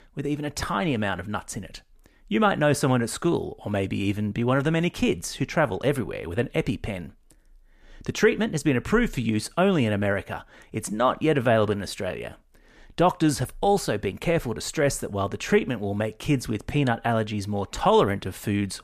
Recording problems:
none

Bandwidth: 14.5 kHz